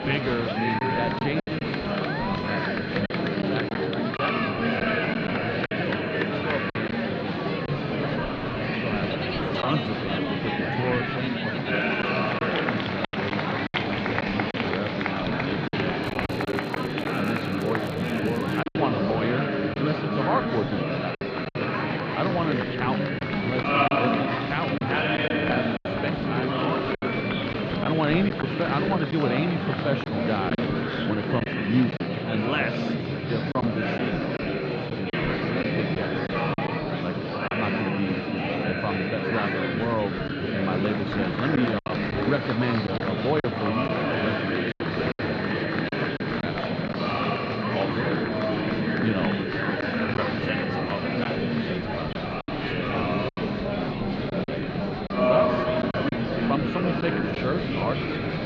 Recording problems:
muffled; slightly; fading above 4 kHz
murmuring crowd; very loud; throughout; 4 dB above the speech
high-pitched whine; noticeable; throughout; 4 kHz, 20 dB below the speech
crackling; faint; from 16 to 19 s; 20 dB below the speech
choppy; occasionally; 5% of the speech affected

